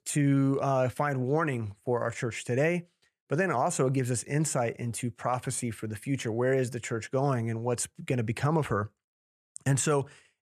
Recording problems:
none

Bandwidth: 14 kHz